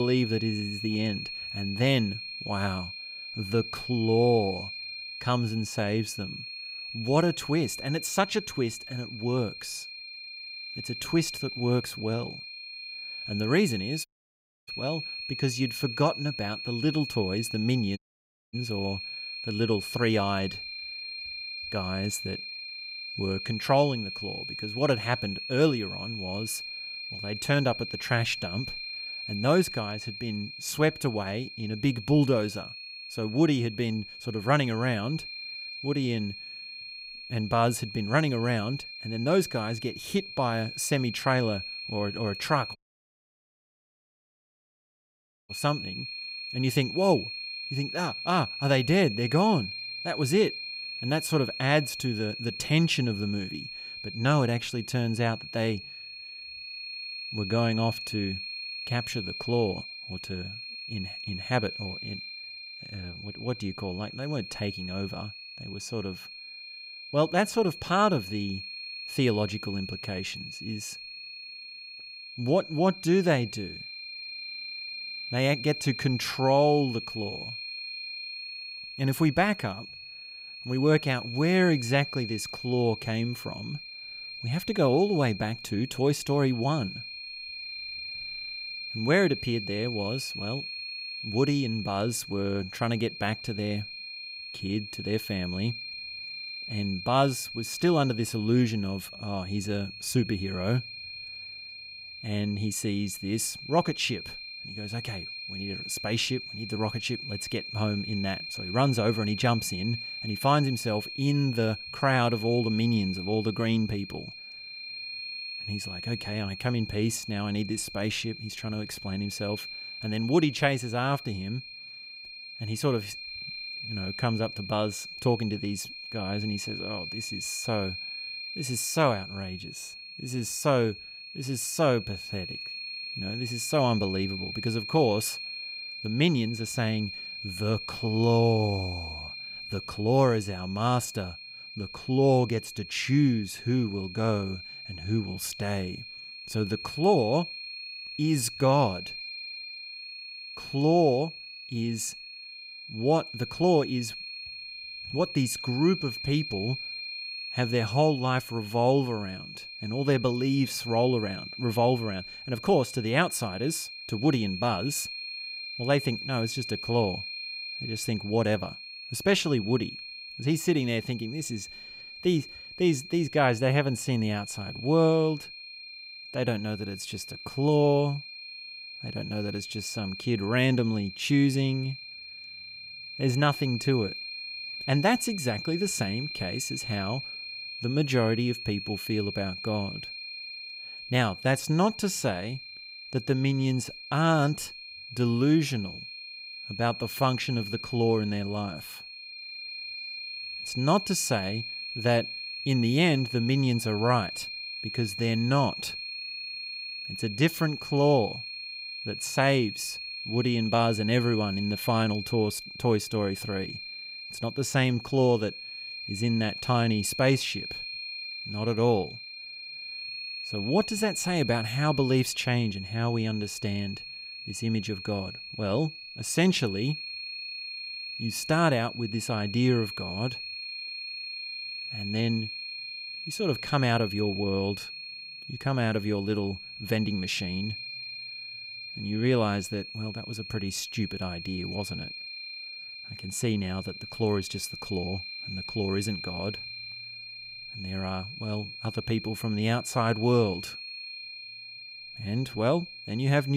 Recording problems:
high-pitched whine; loud; throughout; 4 kHz, 8 dB below the speech
abrupt cut into speech; at the start and the end
audio cutting out; at 14 s for 0.5 s, at 18 s for 0.5 s and at 43 s for 2.5 s

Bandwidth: 15.5 kHz